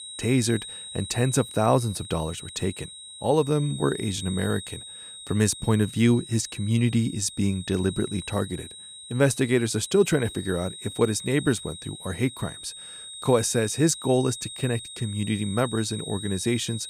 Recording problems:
high-pitched whine; noticeable; throughout; 4 kHz, 10 dB below the speech

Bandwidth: 15 kHz